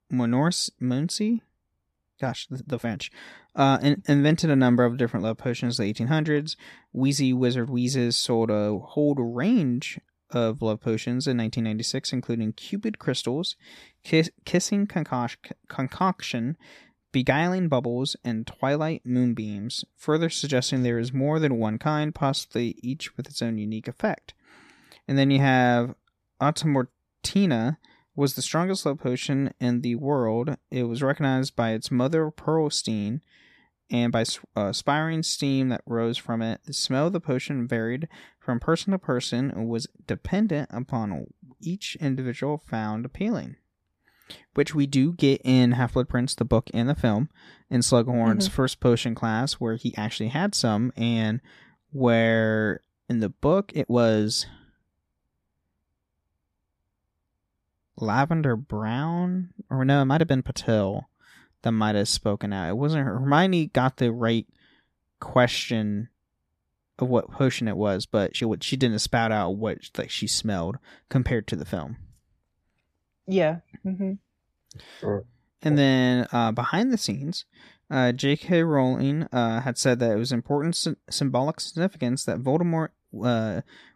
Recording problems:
uneven, jittery; strongly; from 2 s to 1:19

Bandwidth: 14 kHz